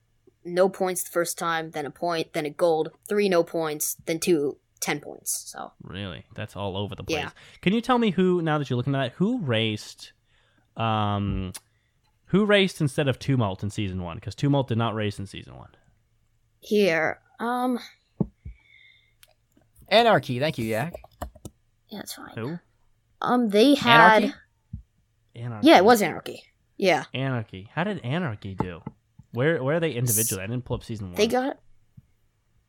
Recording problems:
none

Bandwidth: 17 kHz